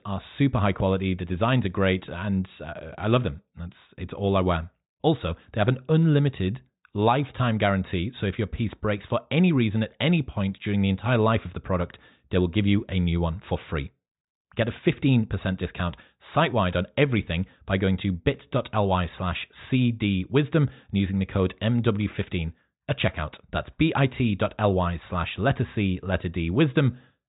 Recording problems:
high frequencies cut off; severe; nothing above 4 kHz

